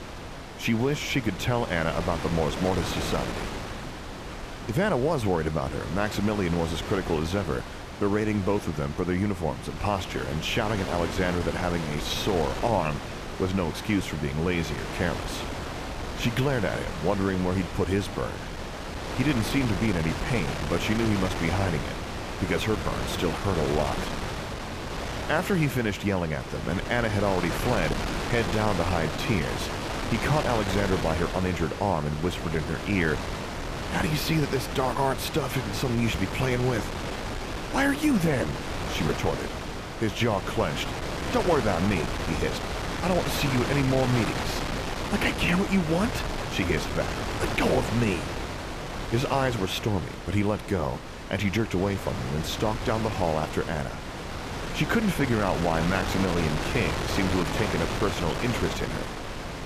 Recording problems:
wind noise on the microphone; heavy; 4 dB below the speech

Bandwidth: 14.5 kHz